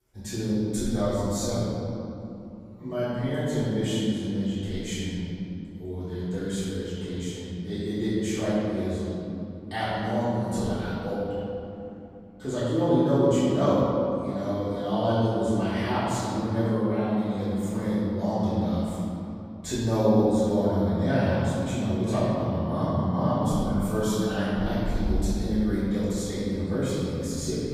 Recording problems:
room echo; strong; dies away in 2.8 s
off-mic speech; far

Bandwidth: 15 kHz